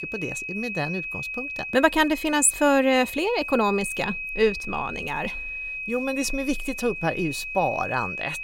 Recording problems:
high-pitched whine; loud; throughout; 2.5 kHz, 7 dB below the speech

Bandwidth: 16 kHz